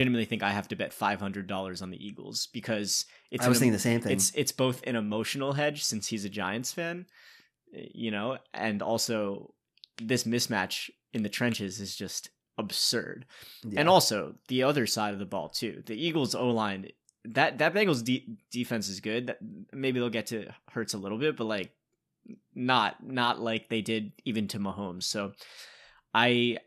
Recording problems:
abrupt cut into speech; at the start

